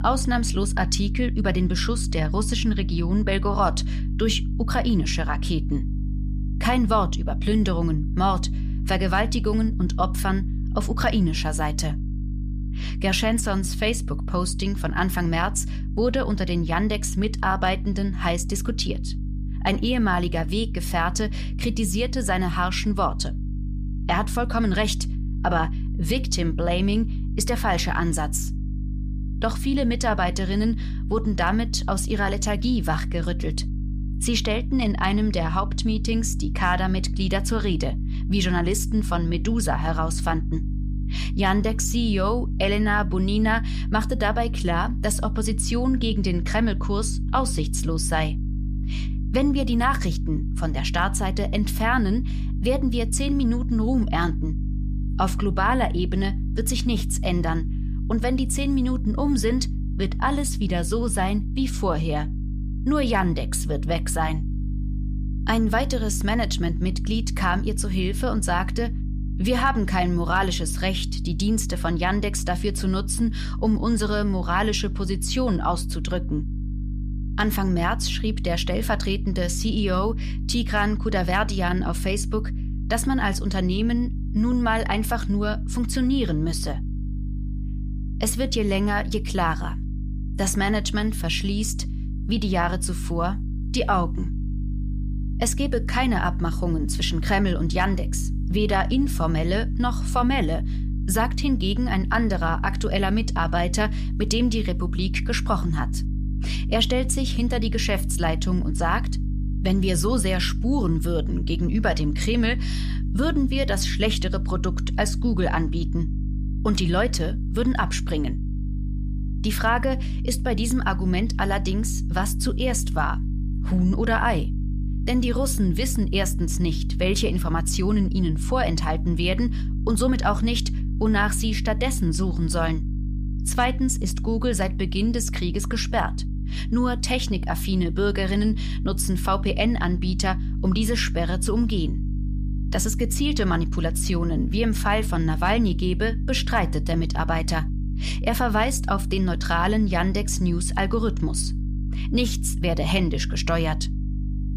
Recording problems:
electrical hum; noticeable; throughout; 50 Hz, 15 dB below the speech

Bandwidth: 14.5 kHz